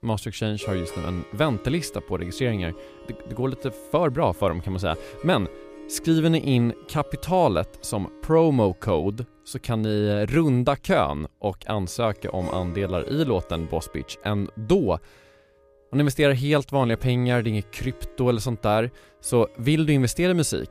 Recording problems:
background music; noticeable; throughout; 20 dB below the speech

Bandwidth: 15 kHz